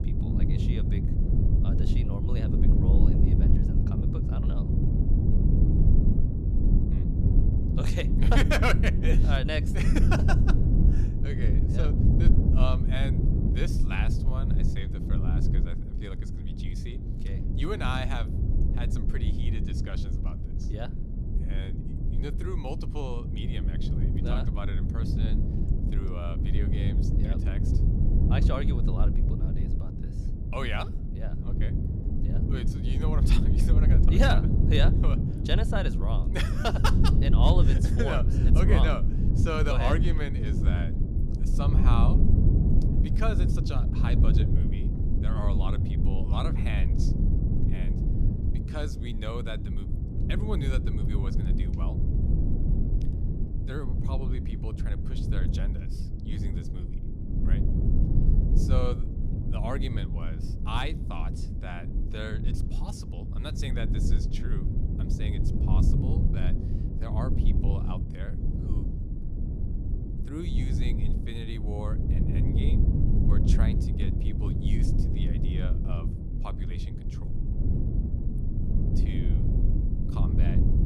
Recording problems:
low rumble; loud; throughout; 3 dB below the speech

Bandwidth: 15 kHz